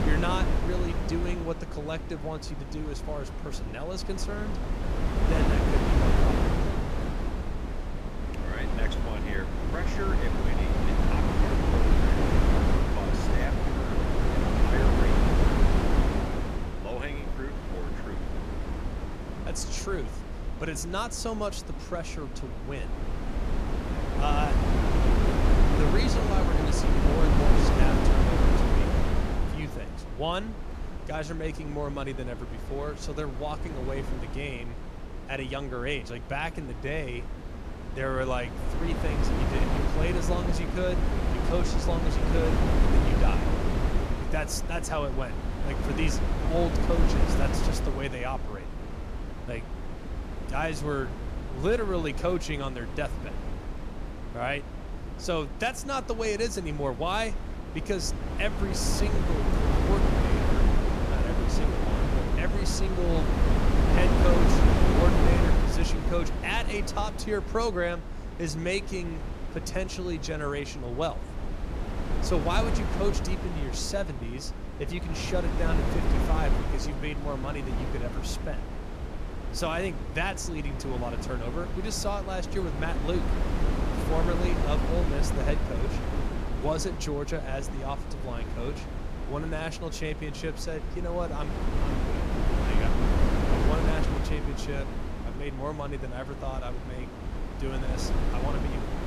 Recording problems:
wind noise on the microphone; heavy; 1 dB below the speech

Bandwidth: 14.5 kHz